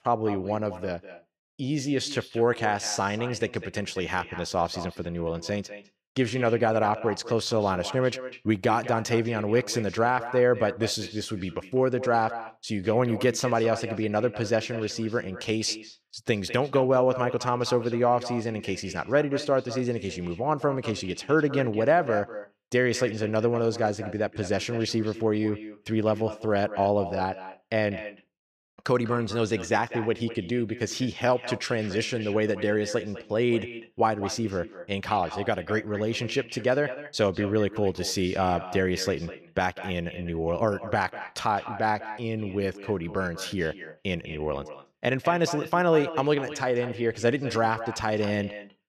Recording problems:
echo of what is said; noticeable; throughout; 200 ms later, 15 dB below the speech

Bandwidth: 14.5 kHz